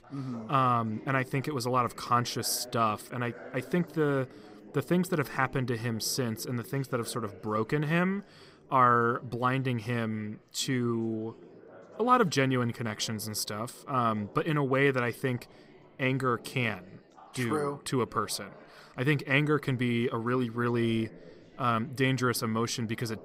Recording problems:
chatter from many people; faint; throughout; 20 dB below the speech

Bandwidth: 15.5 kHz